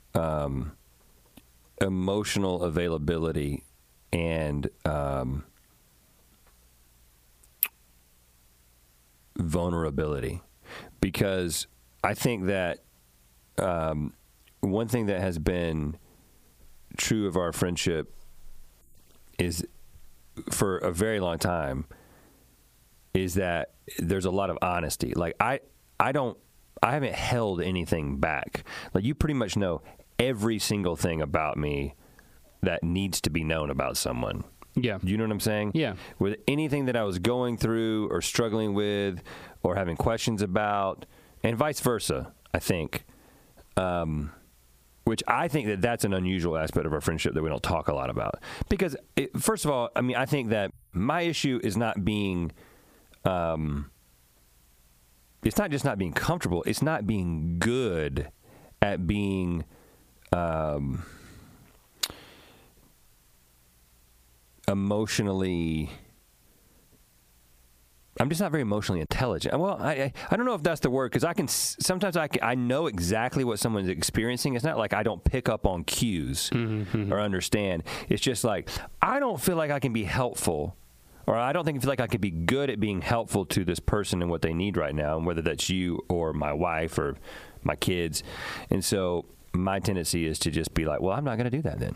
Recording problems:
squashed, flat; heavily

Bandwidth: 15 kHz